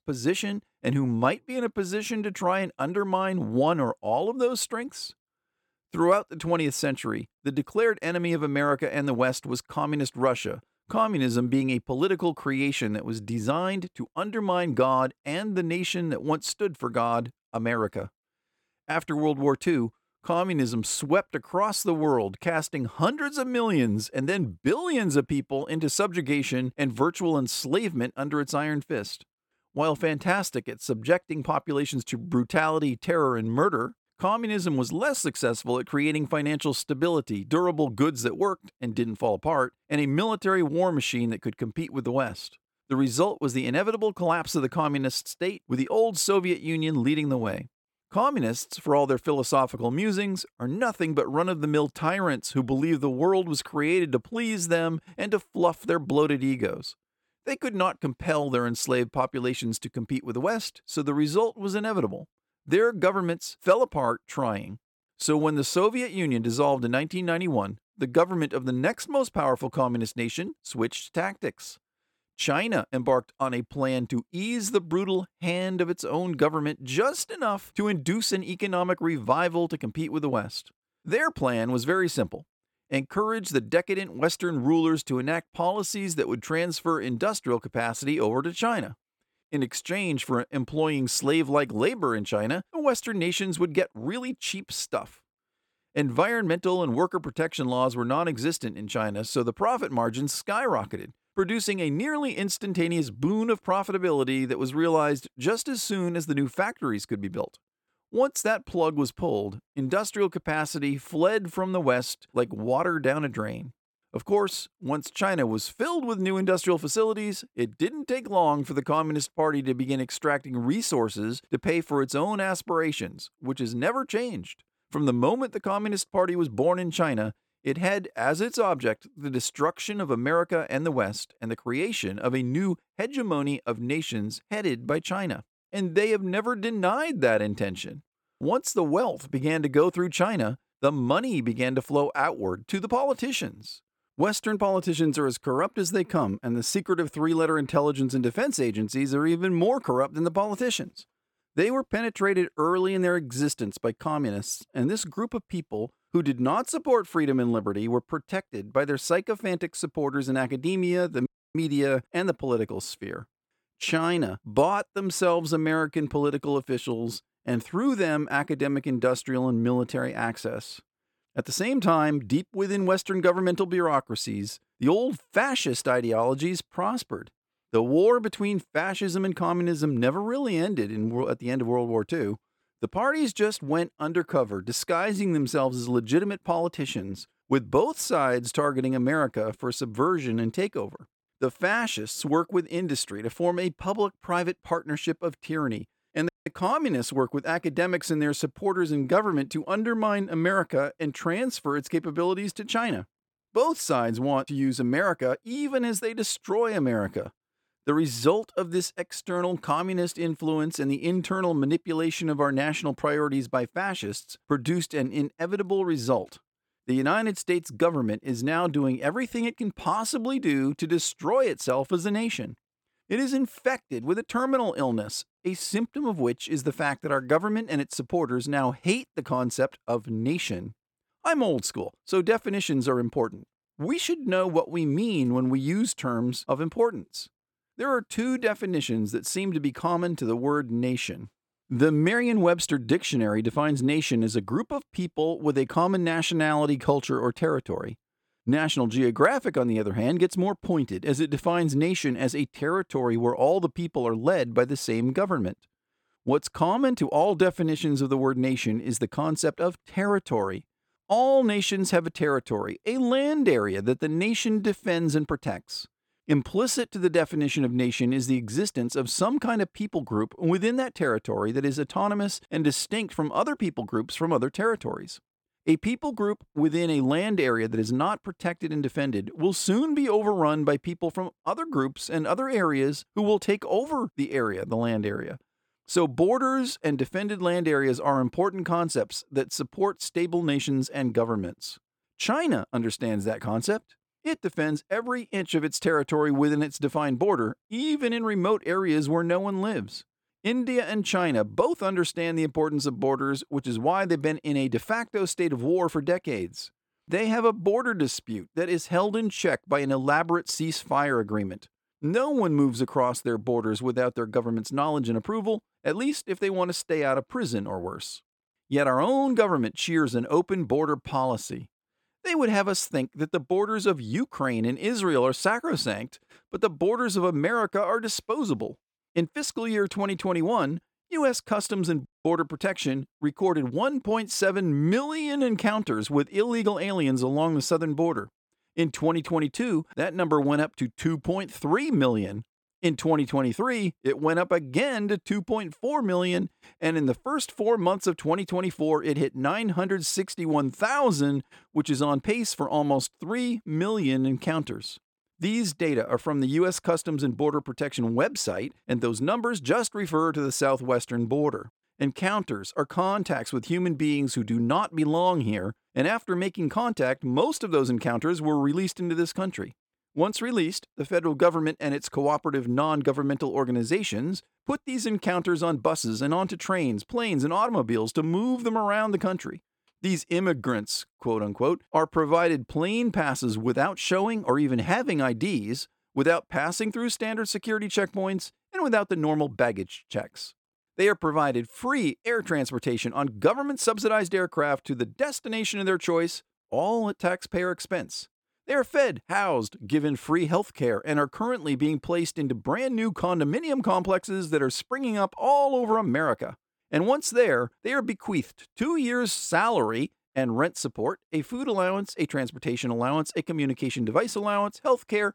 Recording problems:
audio cutting out; at 2:41, at 3:16 and at 5:32

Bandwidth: 17.5 kHz